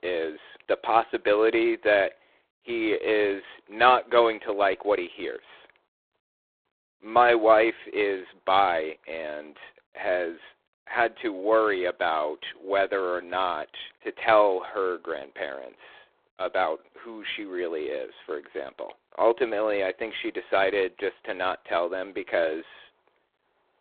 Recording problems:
phone-call audio; poor line

